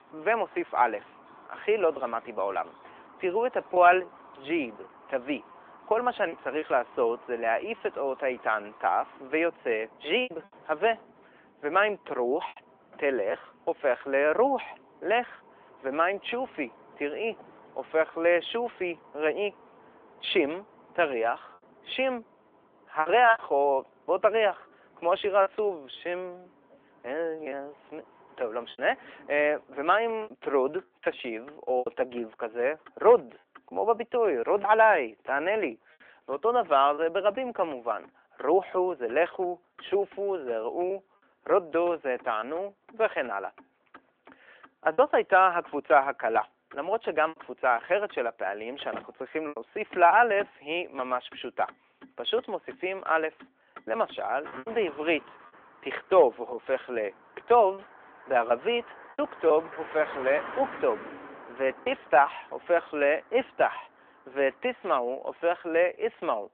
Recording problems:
phone-call audio; nothing above 3.5 kHz
traffic noise; faint; throughout; 25 dB below the speech
choppy; occasionally; 3% of the speech affected

